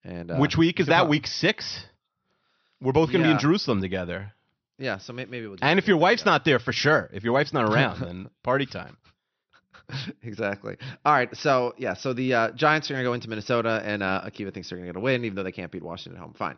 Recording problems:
high frequencies cut off; noticeable; nothing above 6 kHz

